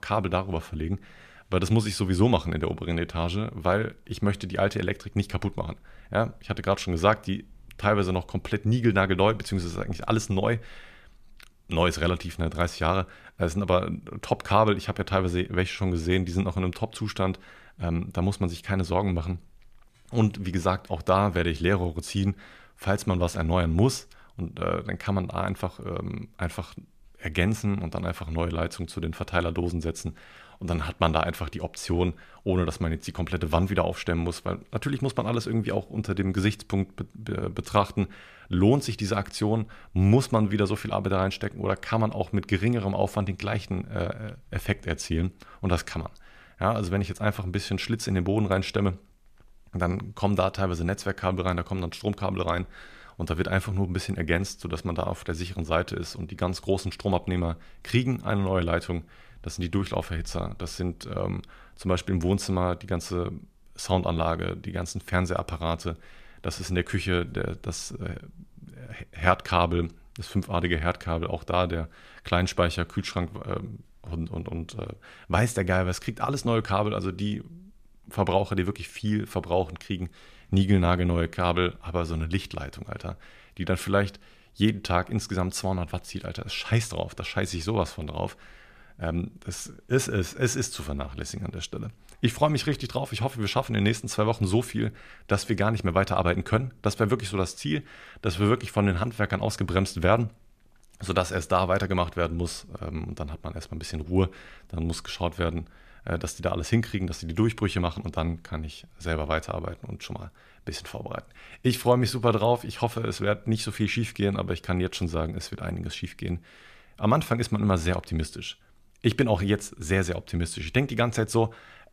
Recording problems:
none

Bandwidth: 14.5 kHz